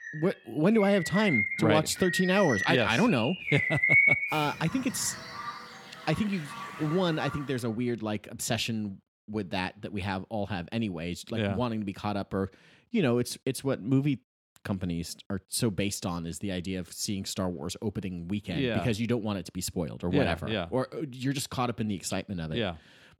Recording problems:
animal sounds; very loud; until 7.5 s; 1 dB above the speech

